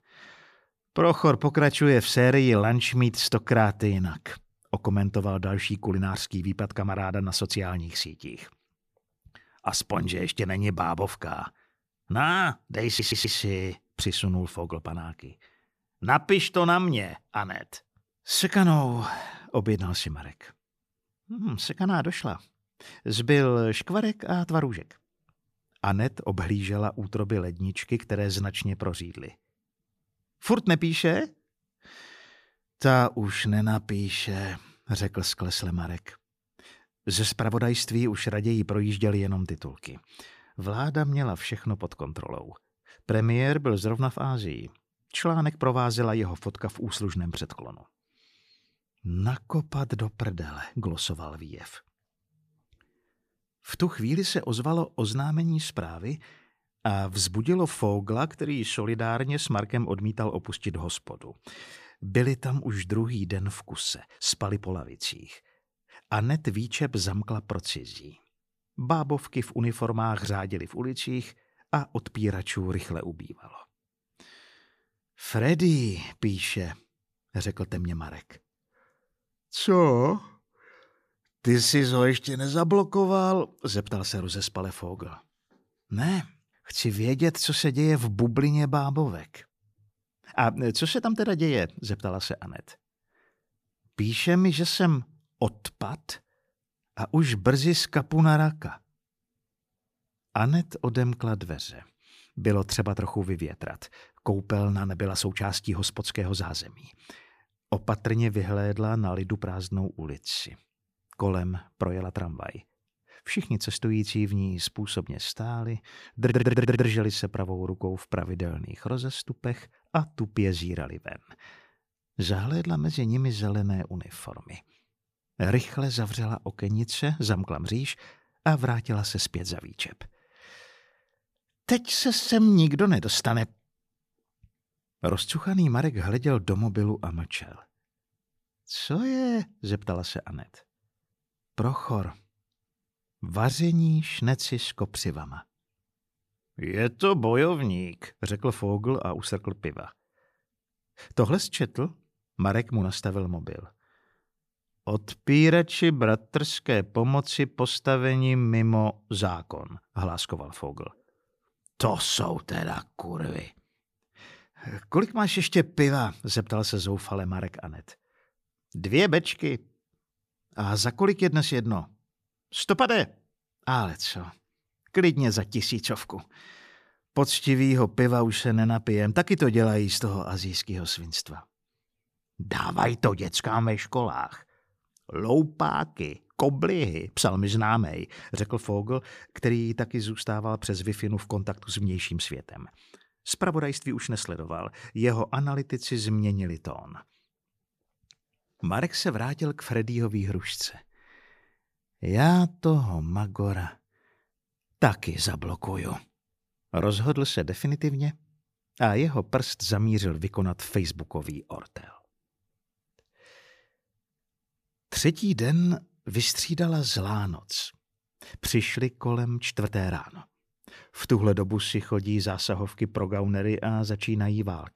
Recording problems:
audio stuttering; at 13 s and at 1:56

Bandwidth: 15 kHz